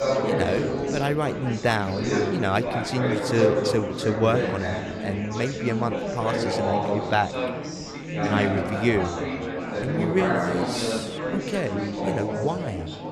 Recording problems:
chatter from many people; loud; throughout; as loud as the speech

